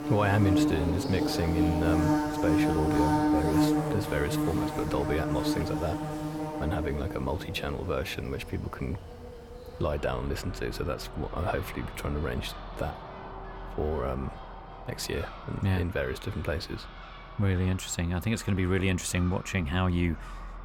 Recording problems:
animal sounds; very loud; throughout; as loud as the speech

